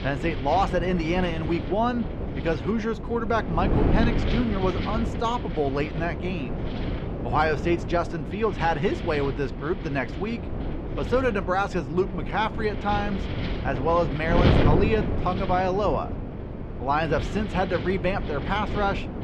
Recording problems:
muffled; slightly; fading above 3.5 kHz
wind noise on the microphone; heavy; 8 dB below the speech

